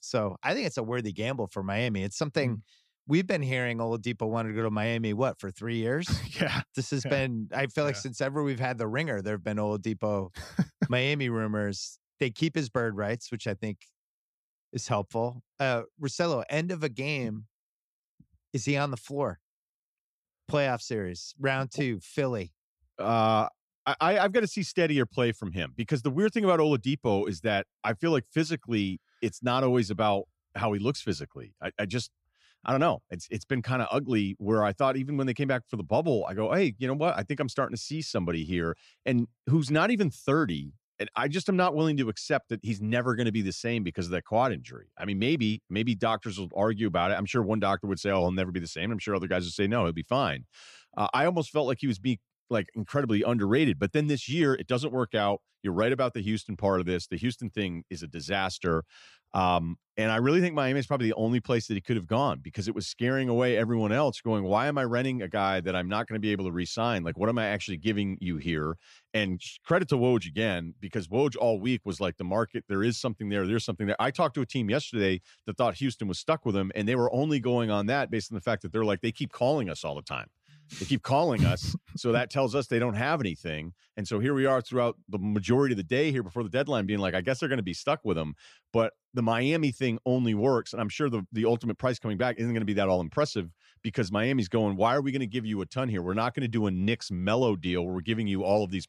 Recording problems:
none

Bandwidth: 14.5 kHz